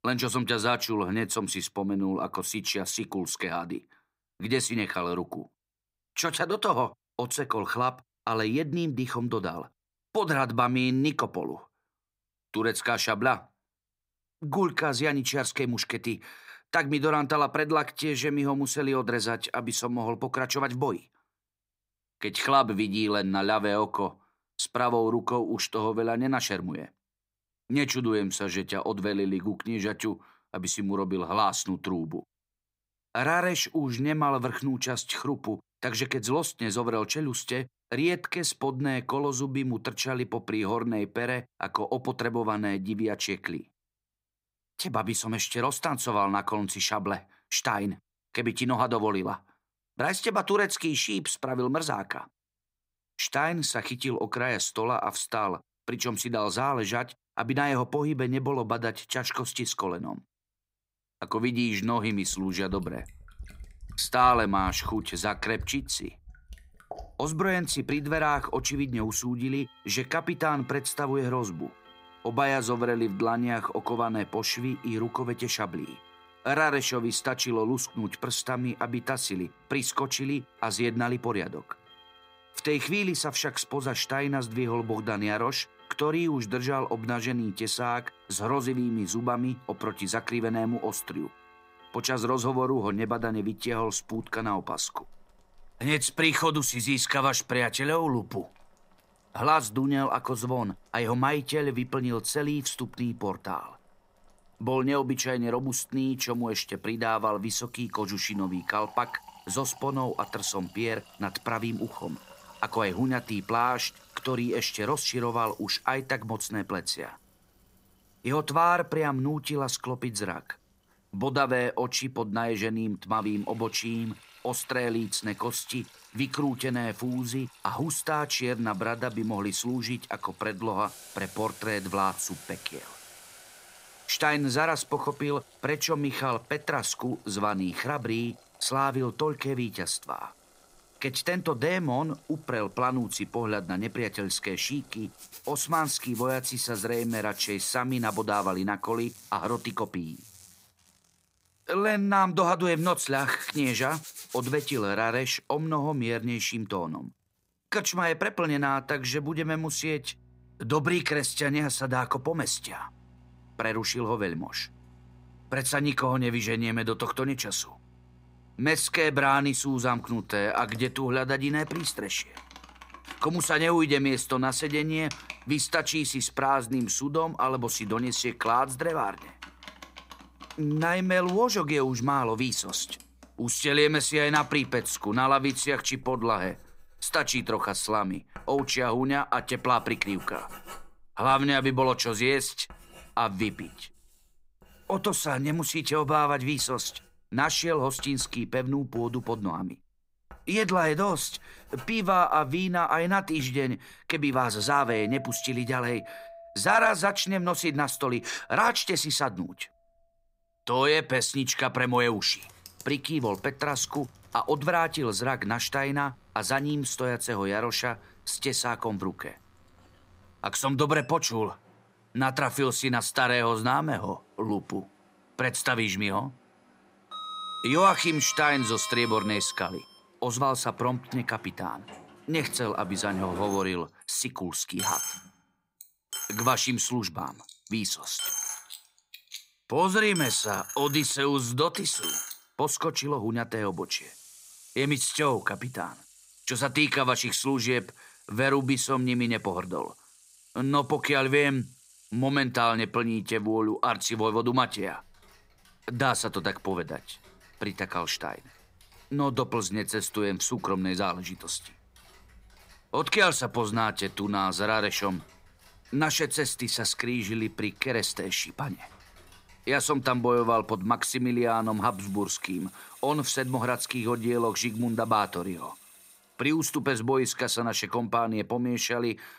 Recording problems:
household noises; noticeable; from 1:02 on; 15 dB below the speech

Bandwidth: 15.5 kHz